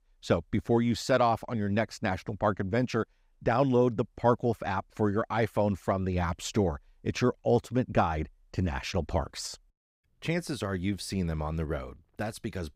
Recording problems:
none

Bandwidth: 15.5 kHz